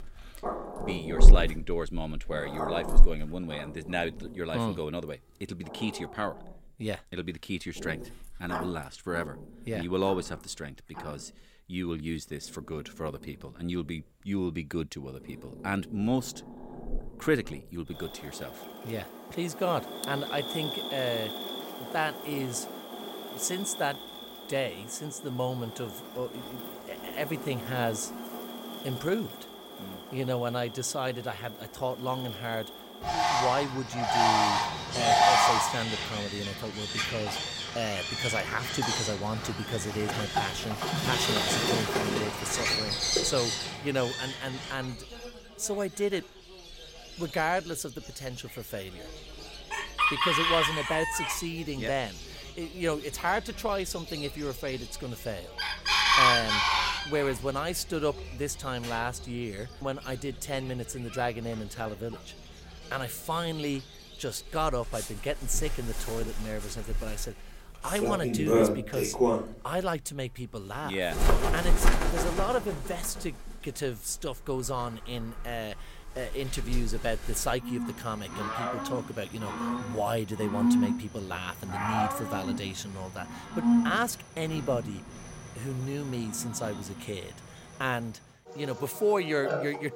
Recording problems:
animal sounds; very loud; throughout; 3 dB above the speech

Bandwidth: 16 kHz